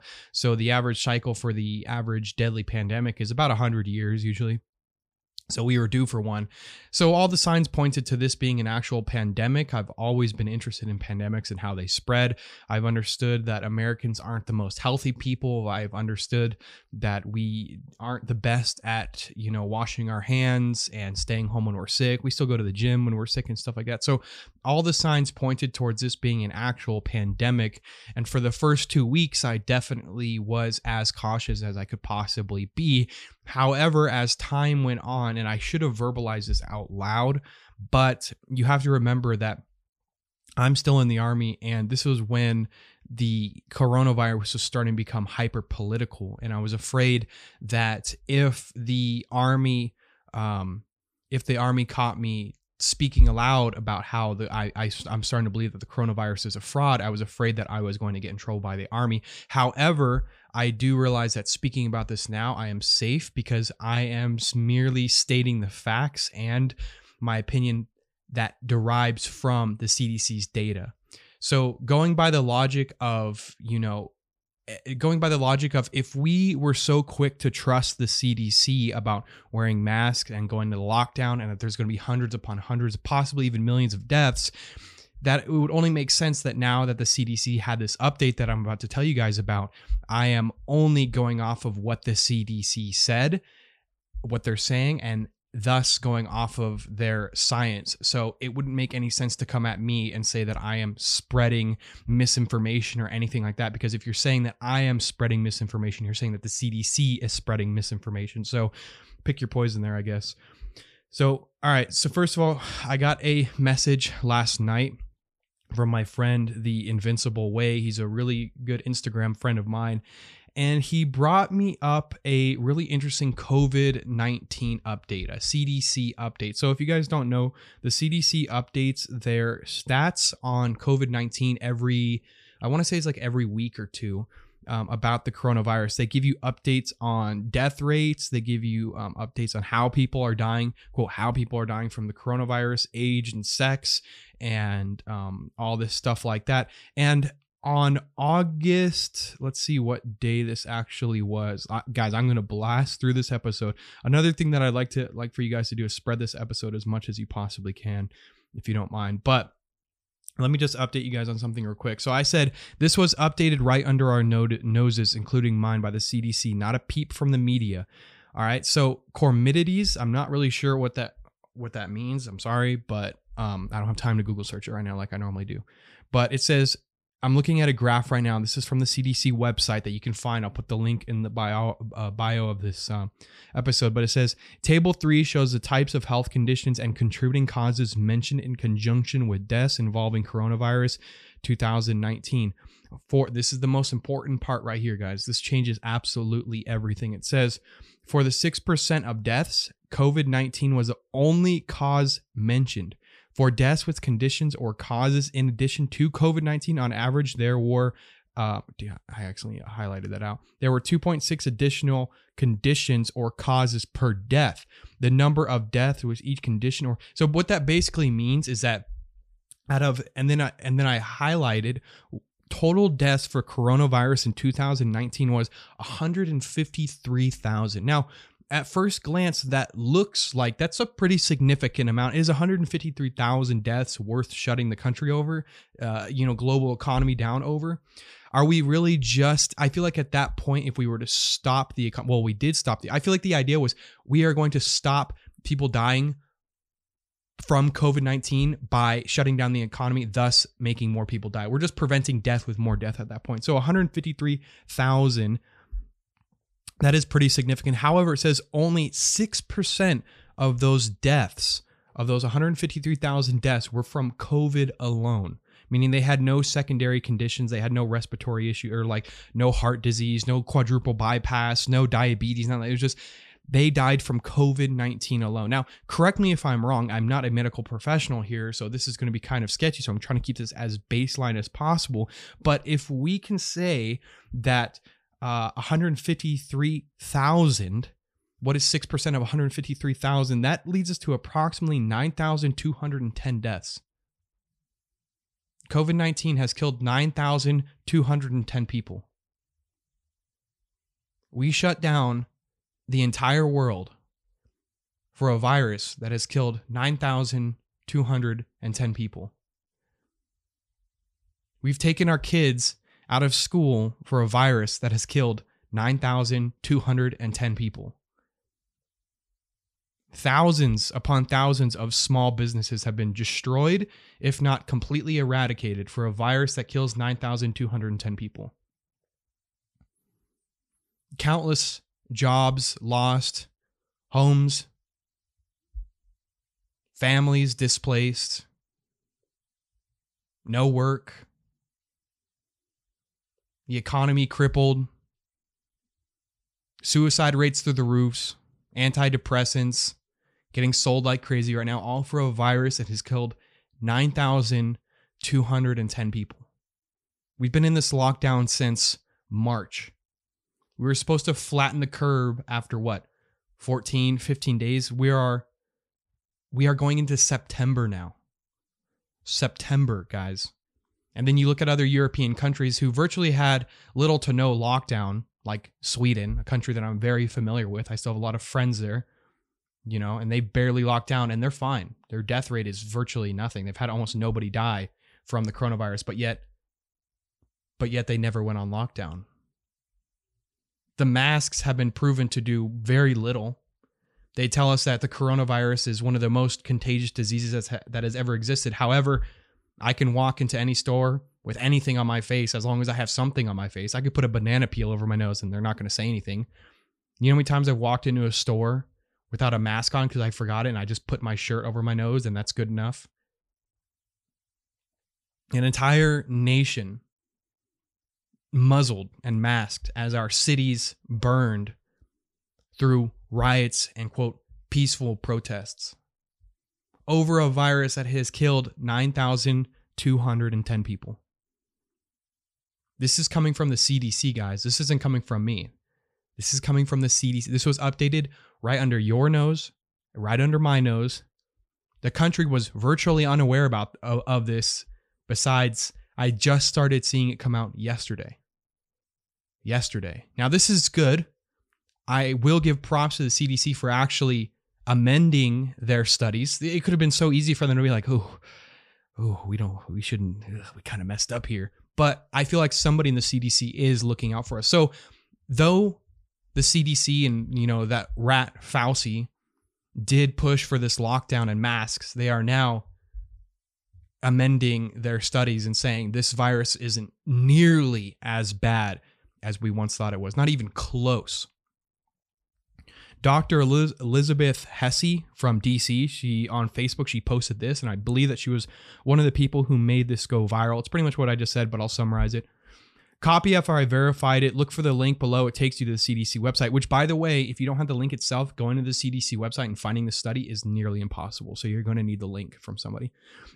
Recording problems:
none

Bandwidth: 15 kHz